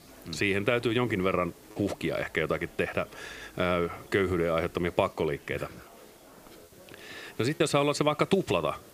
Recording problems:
murmuring crowd; faint; throughout; 25 dB below the speech
hiss; faint; throughout; 25 dB below the speech
choppy; occasionally; 1% of the speech affected

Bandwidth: 15 kHz